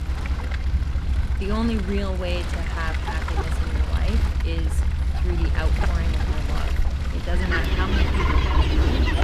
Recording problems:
animal sounds; very loud; throughout; 1 dB above the speech
low rumble; loud; throughout; 10 dB below the speech

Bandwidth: 15 kHz